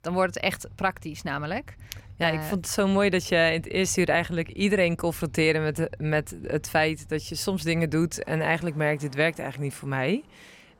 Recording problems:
traffic noise; faint; throughout; 20 dB below the speech

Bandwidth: 16.5 kHz